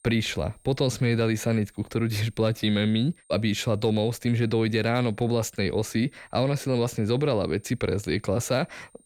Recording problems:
high-pitched whine; faint; throughout; 8.5 kHz, 35 dB below the speech

